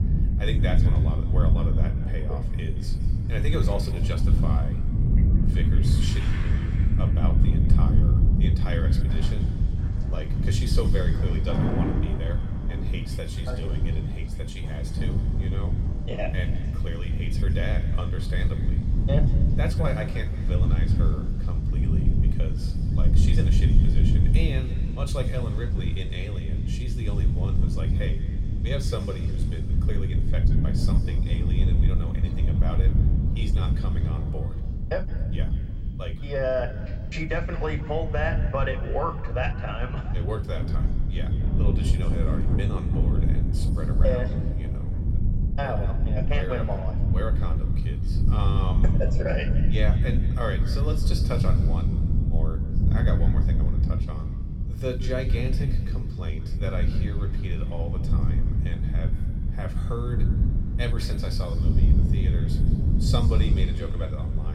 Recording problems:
room echo; slight; dies away in 1.8 s
off-mic speech; somewhat distant
wind noise on the microphone; heavy; 4 dB below the speech
rain or running water; loud; throughout; 3 dB below the speech
low rumble; faint; throughout; 25 dB below the speech
abrupt cut into speech; at the end

